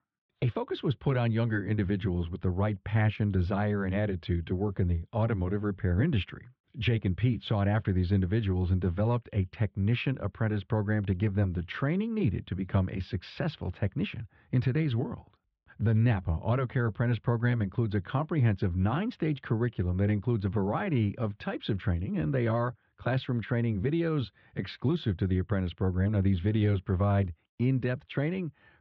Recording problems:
muffled; very; fading above 3.5 kHz

